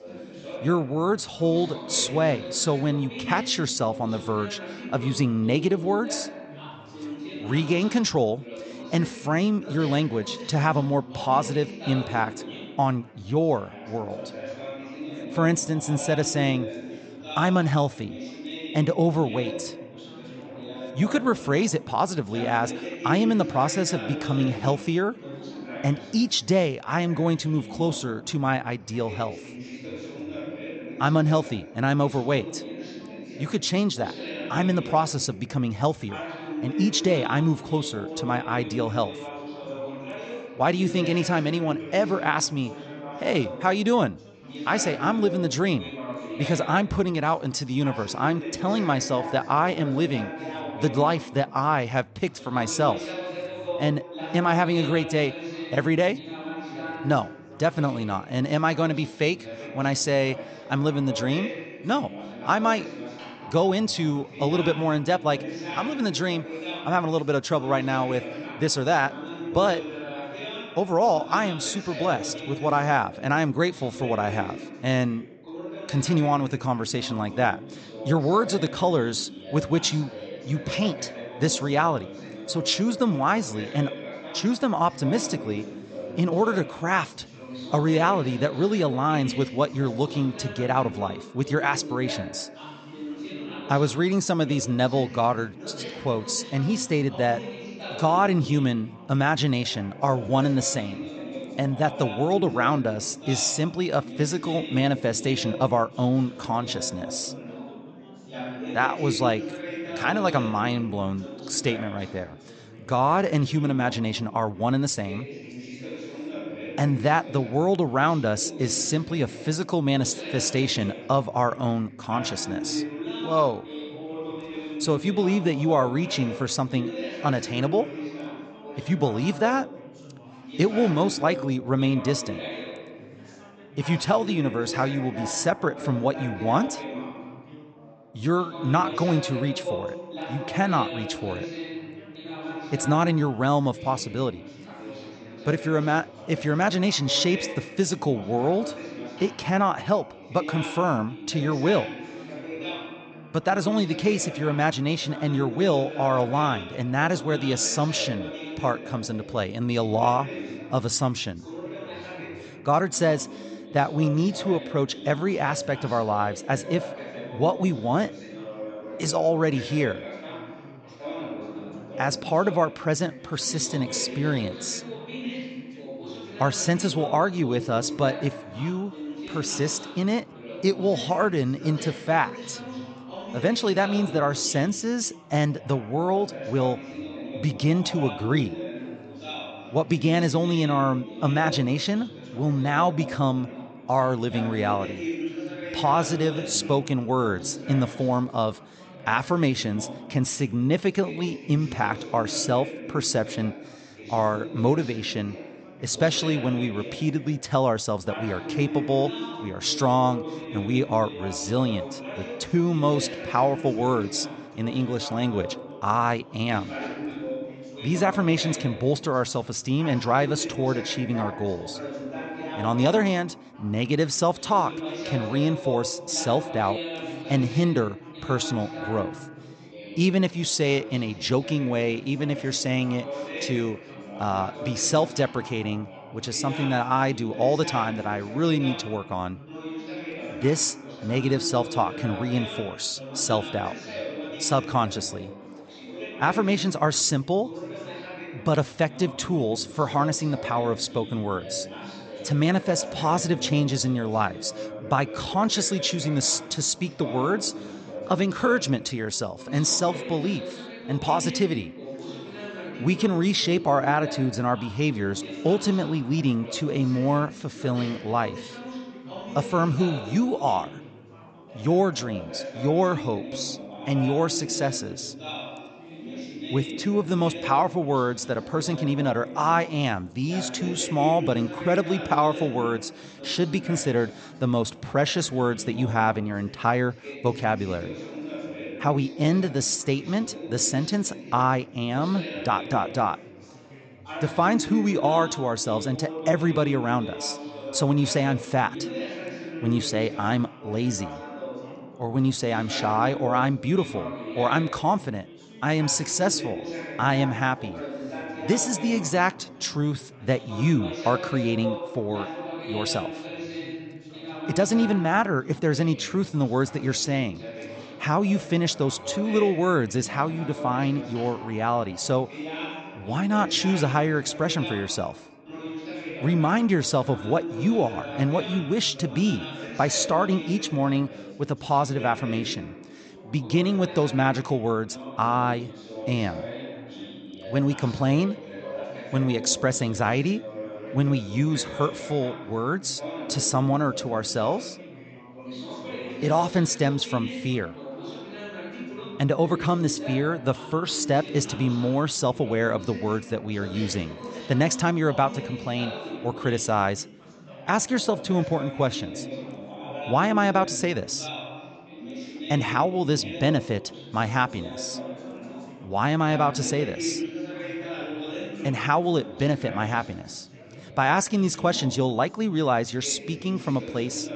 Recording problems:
high frequencies cut off; noticeable; nothing above 8 kHz
background chatter; noticeable; throughout; 4 voices, 10 dB below the speech

